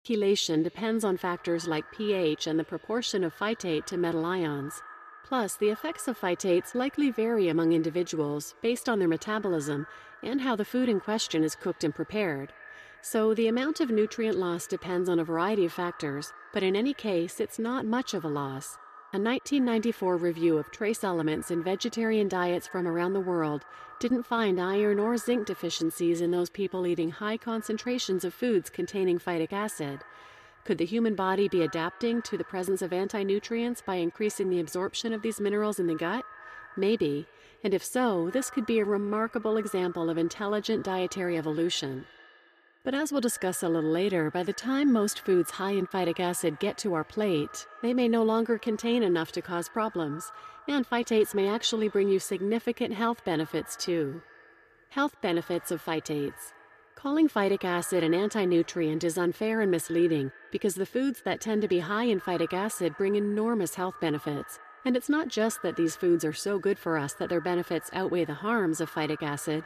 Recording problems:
echo of what is said; faint; throughout; 120 ms later, 20 dB below the speech

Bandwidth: 14.5 kHz